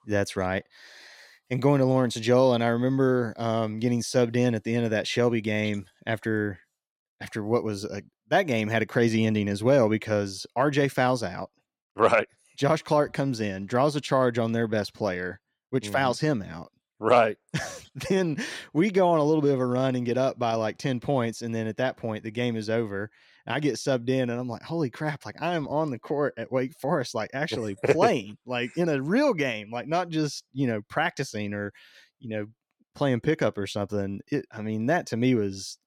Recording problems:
none

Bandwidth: 17 kHz